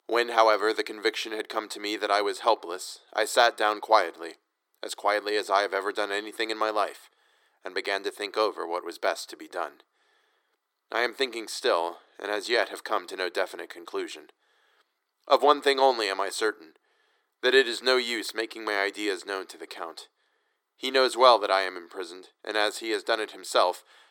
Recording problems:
thin; very; fading below 350 Hz

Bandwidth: 17.5 kHz